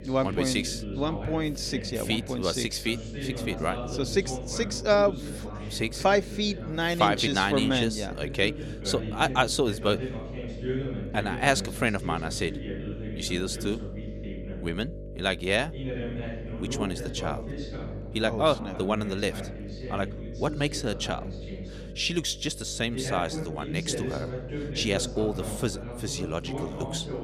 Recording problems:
voice in the background; loud; throughout; 9 dB below the speech
electrical hum; noticeable; throughout; 50 Hz, 20 dB below the speech

